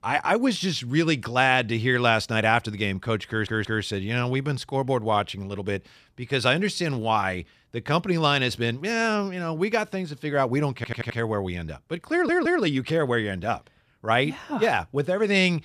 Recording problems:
audio stuttering; at 3.5 s, at 11 s and at 12 s

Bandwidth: 14.5 kHz